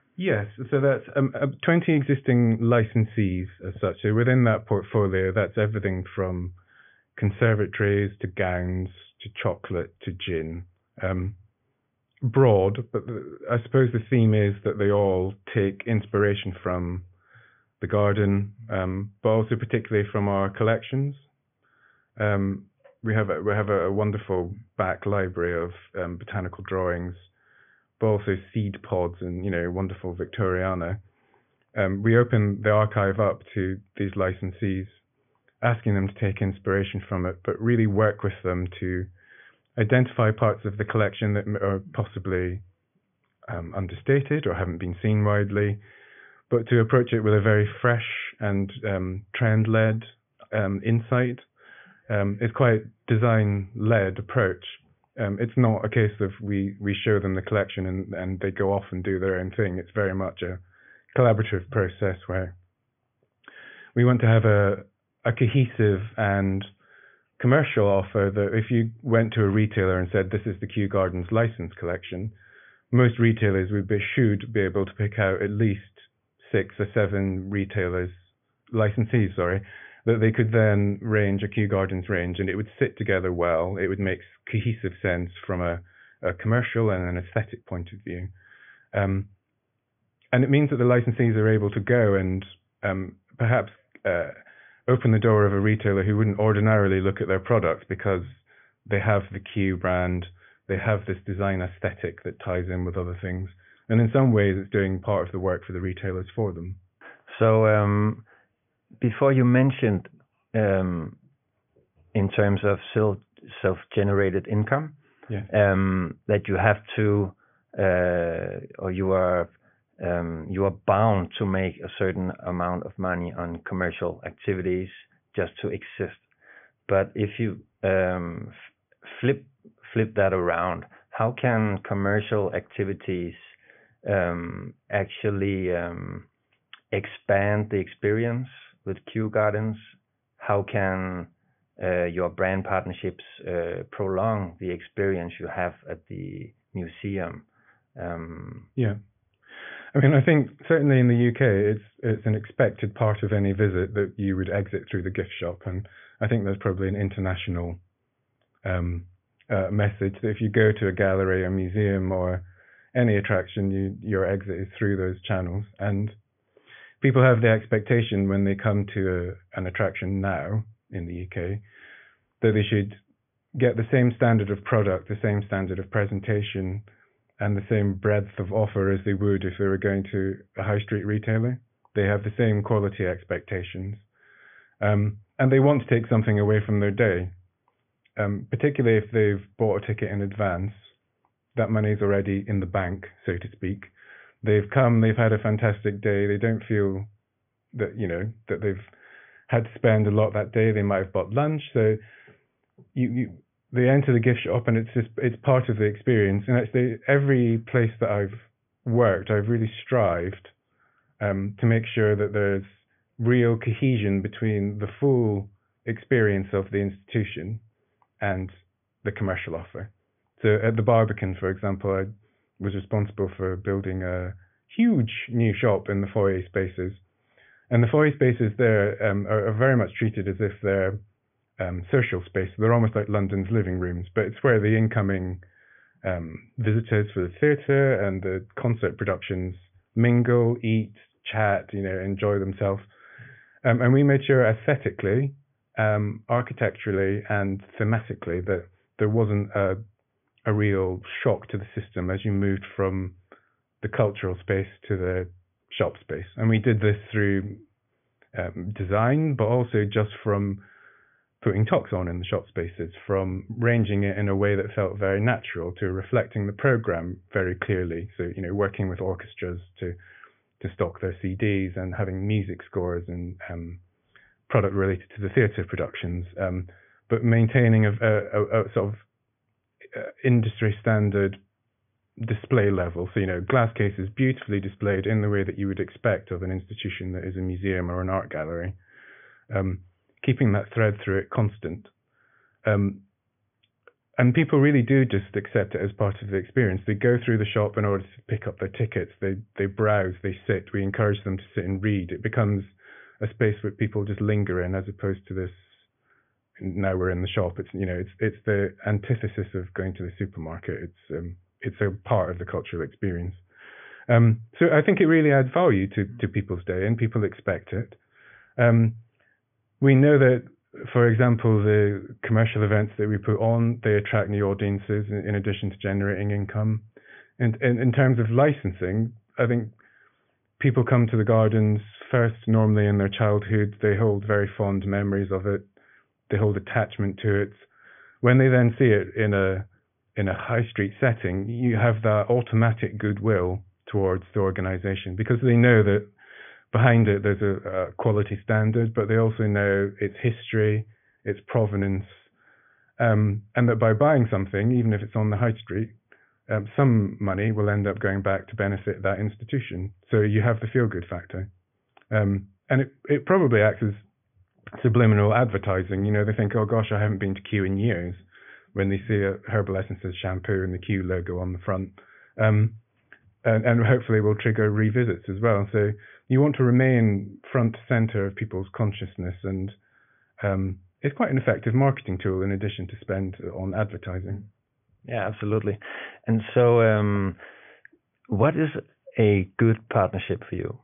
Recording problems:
high frequencies cut off; severe; nothing above 3.5 kHz

